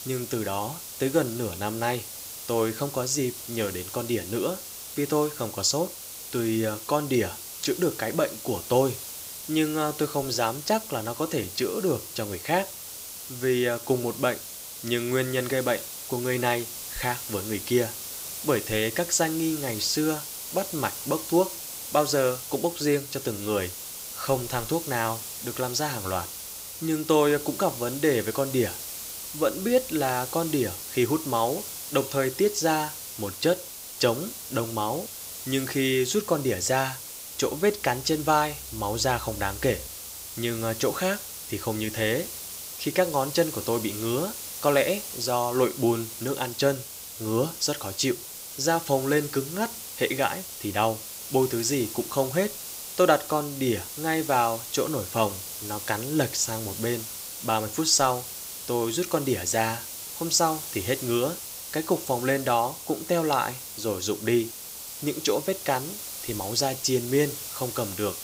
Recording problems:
hiss; loud; throughout; 8 dB below the speech

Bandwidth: 15.5 kHz